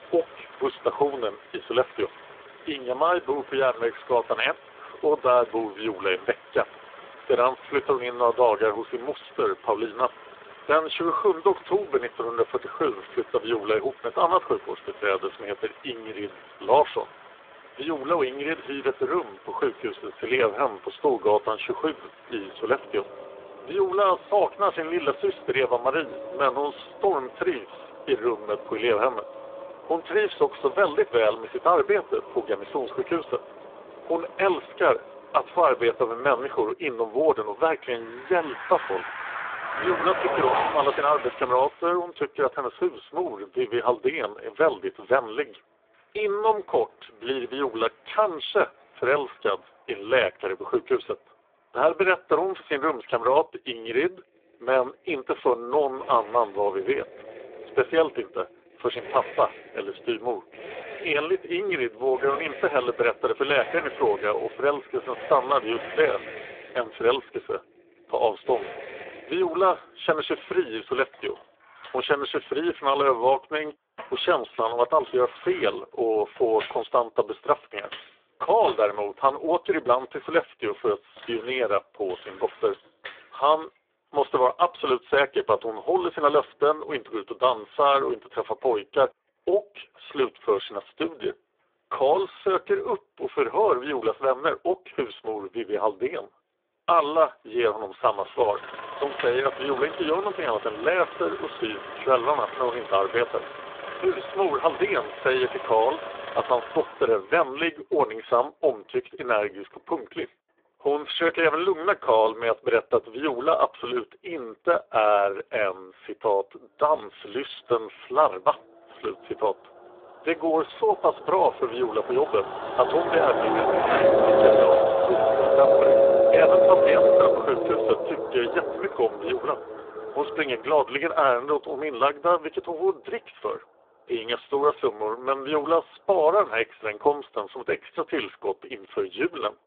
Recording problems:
phone-call audio; poor line
traffic noise; loud; throughout; 1 dB below the speech

